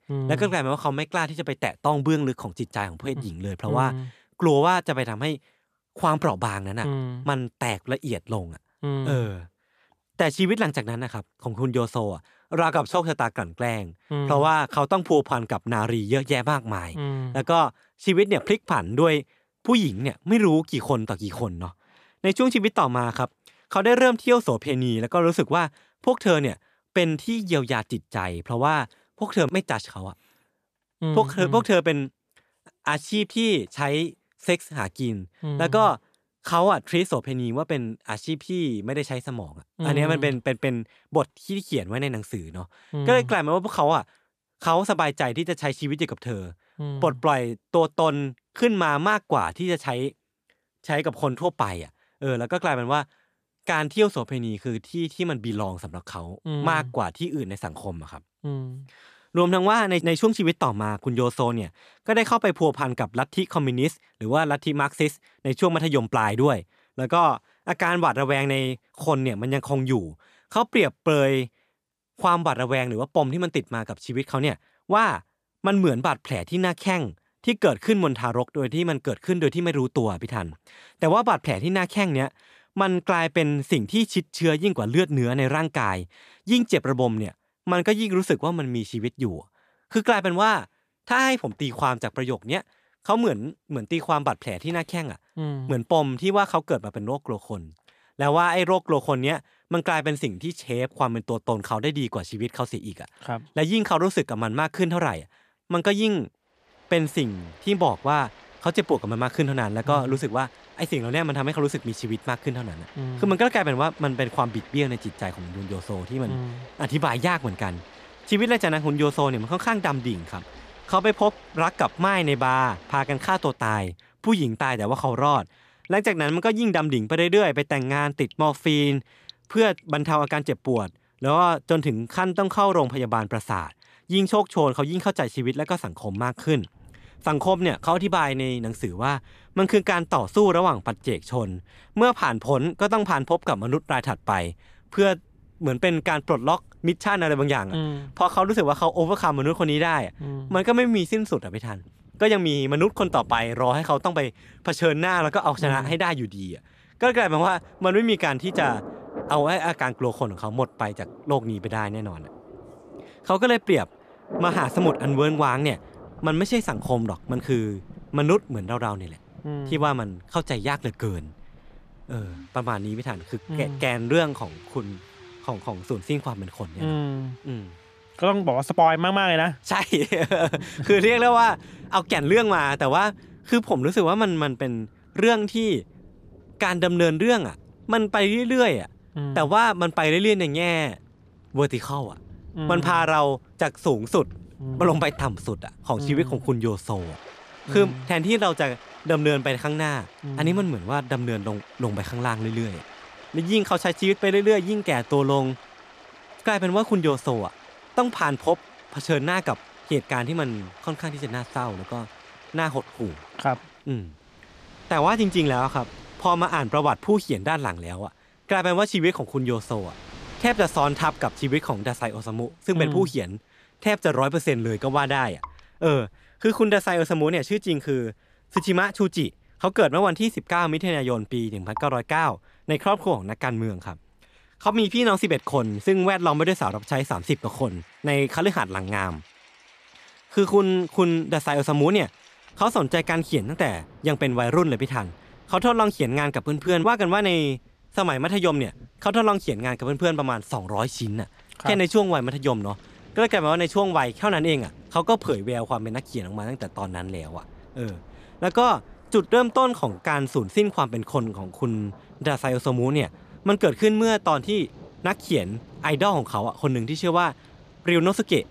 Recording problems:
rain or running water; faint; from 1:47 on; 20 dB below the speech

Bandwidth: 14.5 kHz